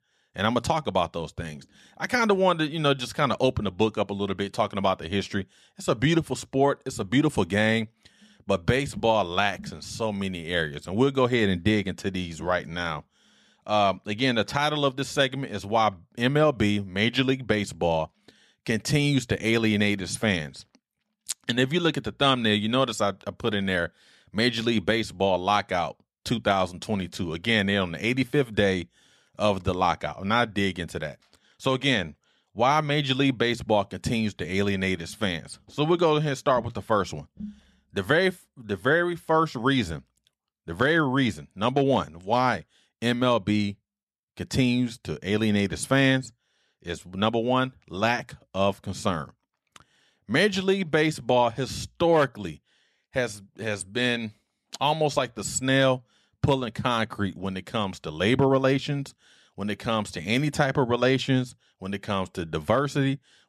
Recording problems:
none

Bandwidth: 13.5 kHz